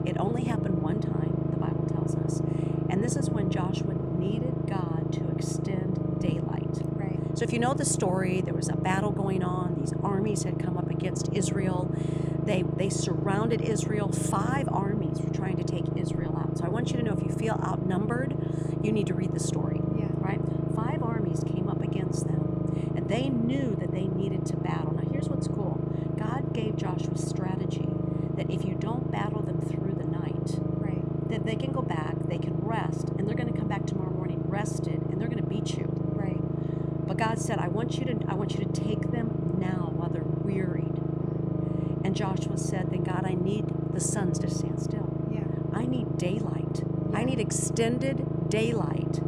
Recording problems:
low rumble; loud; throughout; 1 dB below the speech

